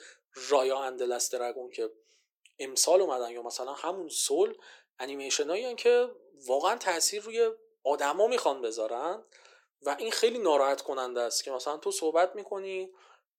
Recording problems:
thin; very; fading below 350 Hz

